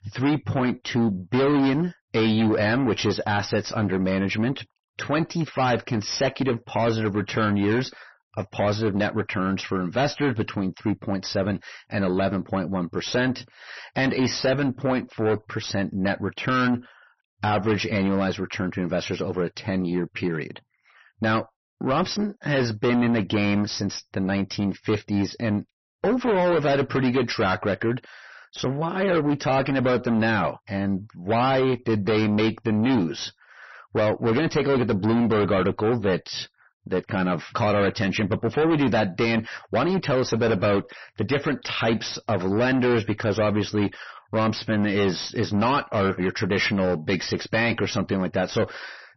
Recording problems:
distortion; heavy; 6 dB below the speech
garbled, watery; slightly; nothing above 6 kHz

